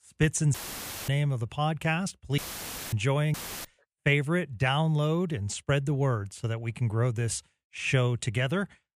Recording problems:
audio cutting out; filled with static; at 0.5 s for 0.5 s, at 2.5 s for 0.5 s and at 3.5 s

